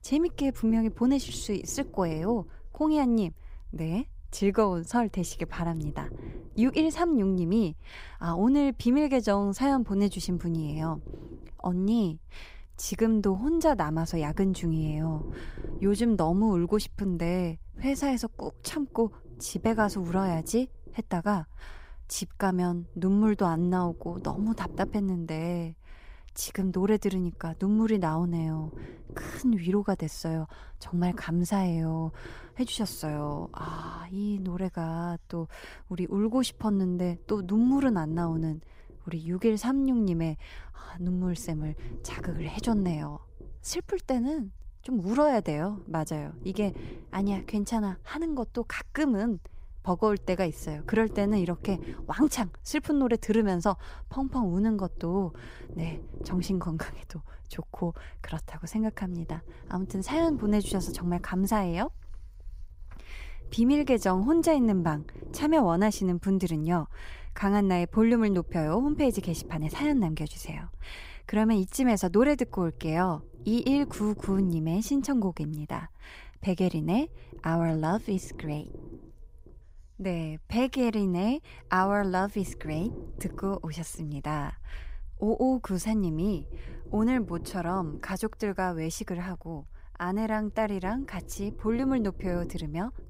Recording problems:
low rumble; noticeable; throughout; 20 dB below the speech

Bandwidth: 15.5 kHz